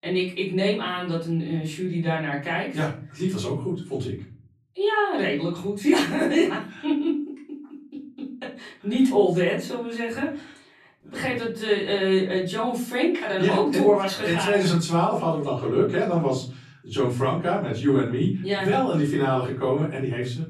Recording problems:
off-mic speech; far
room echo; slight; dies away in 0.5 s

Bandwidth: 13.5 kHz